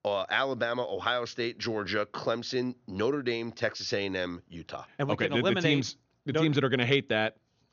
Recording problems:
high frequencies cut off; noticeable; nothing above 6.5 kHz

